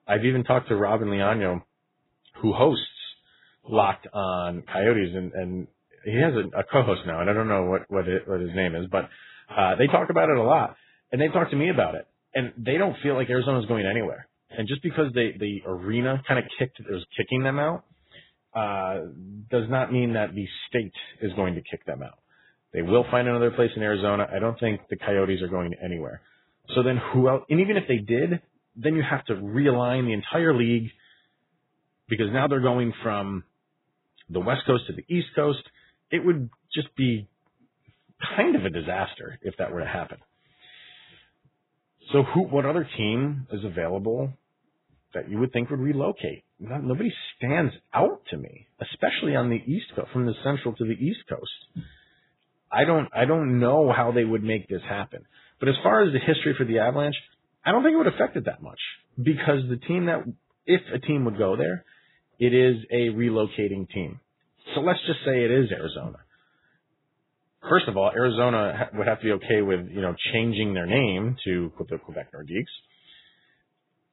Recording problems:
garbled, watery; badly; nothing above 4 kHz

